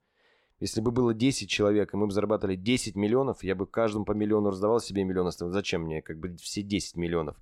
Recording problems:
none

